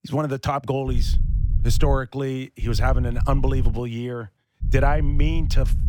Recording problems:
low rumble; noticeable; from 1 to 2 s, from 2.5 to 4 s and from 4.5 s on; 15 dB below the speech

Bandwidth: 17 kHz